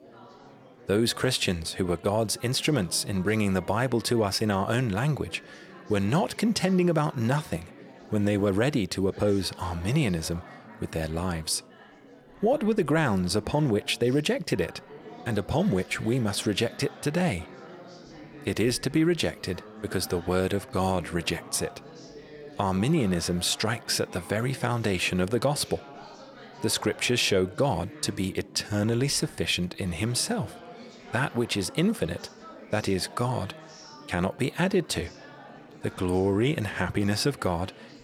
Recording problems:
chatter from many people; noticeable; throughout; 20 dB below the speech

